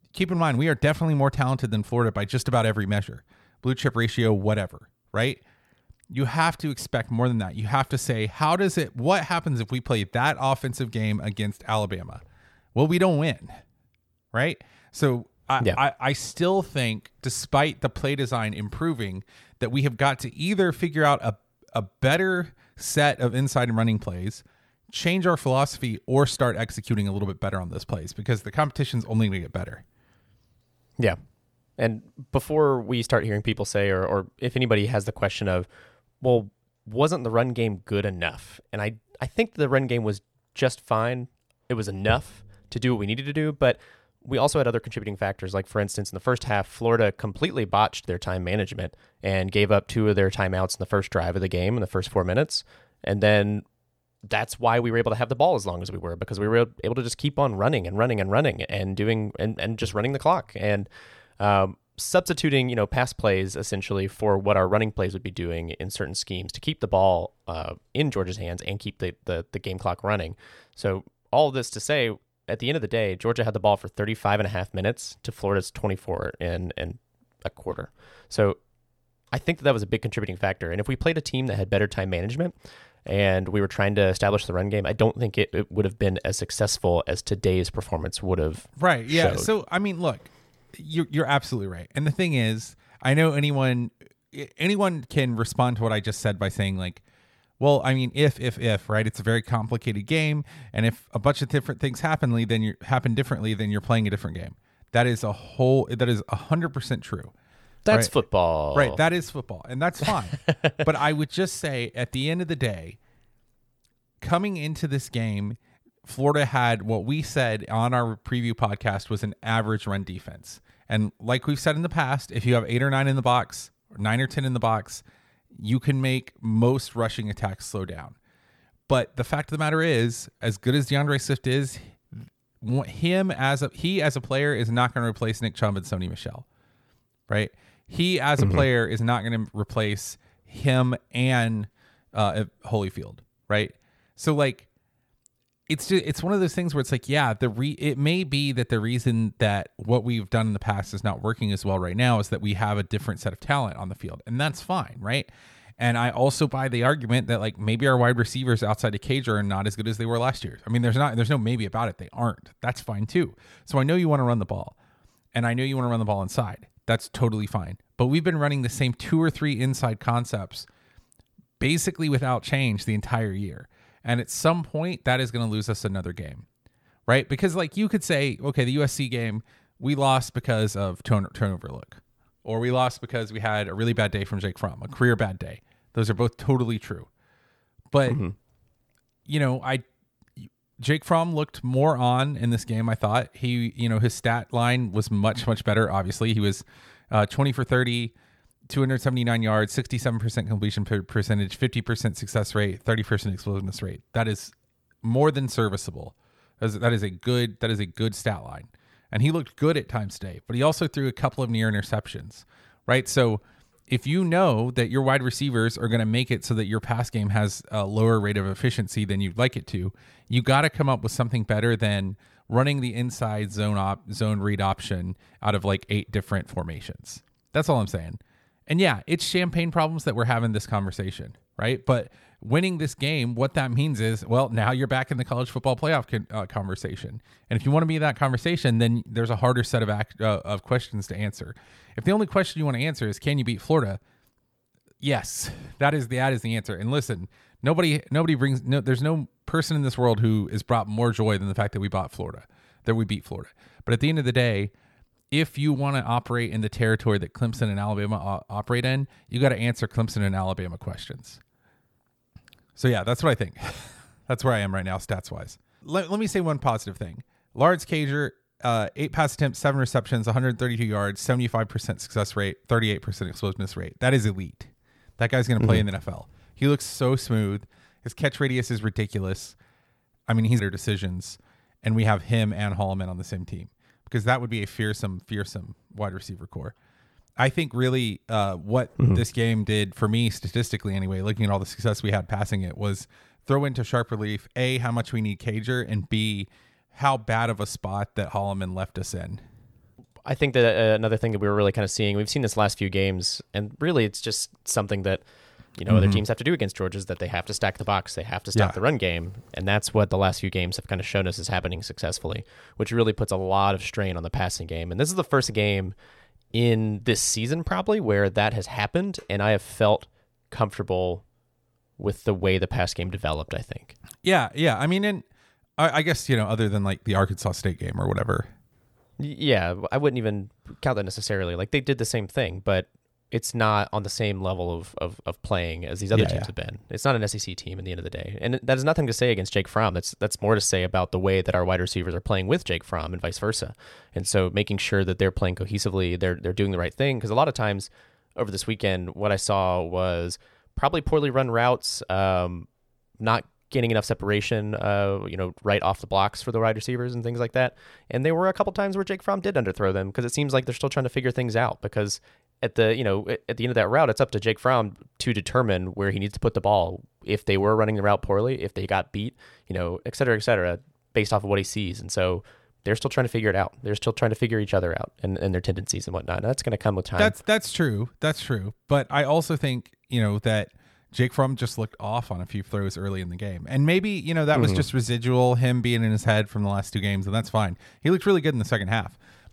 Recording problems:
none

